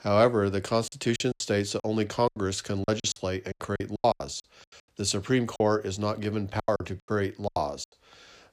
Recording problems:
choppy; very; 15% of the speech affected

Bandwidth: 15 kHz